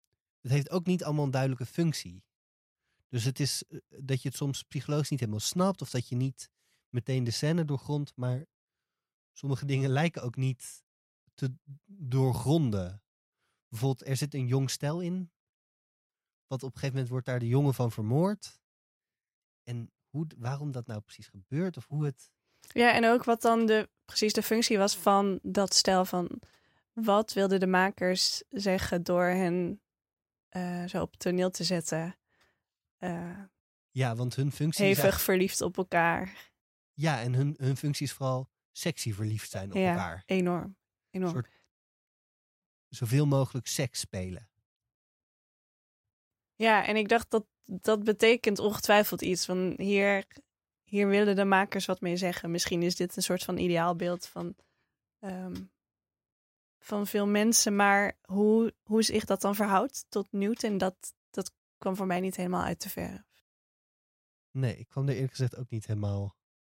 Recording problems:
none

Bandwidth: 16 kHz